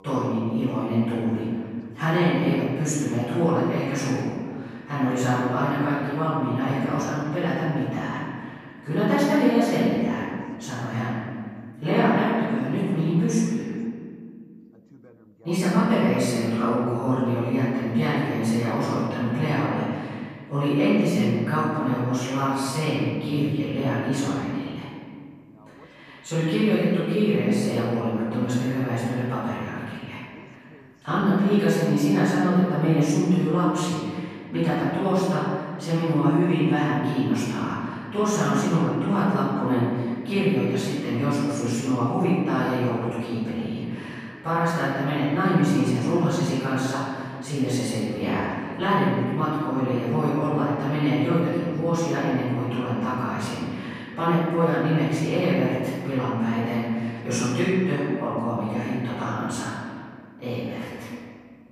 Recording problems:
room echo; strong; dies away in 1.9 s
off-mic speech; far
voice in the background; faint; throughout; 30 dB below the speech

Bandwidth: 14 kHz